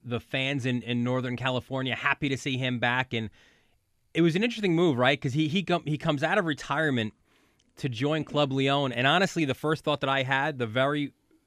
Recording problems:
none

